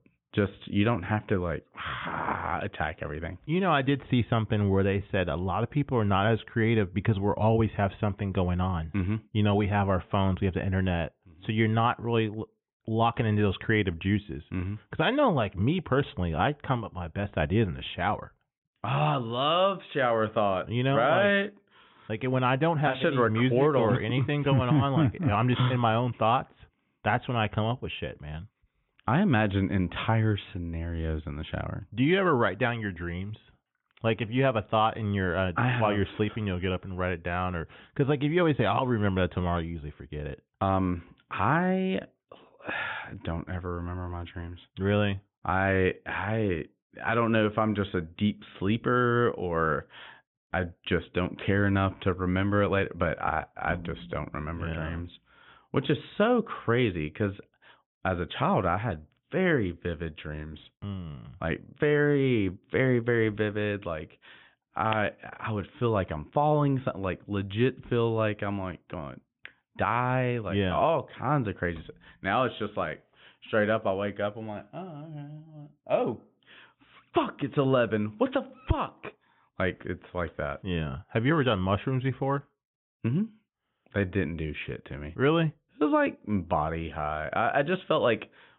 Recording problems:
high frequencies cut off; severe; nothing above 3.5 kHz

